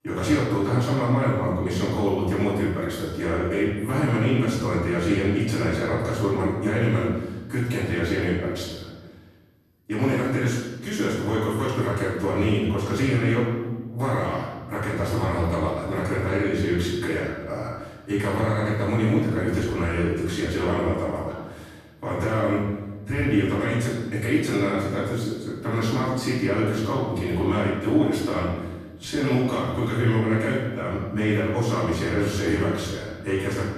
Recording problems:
room echo; strong; dies away in 1.1 s
off-mic speech; far

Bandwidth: 13.5 kHz